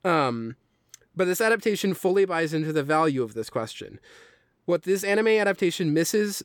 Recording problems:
none

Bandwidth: 18.5 kHz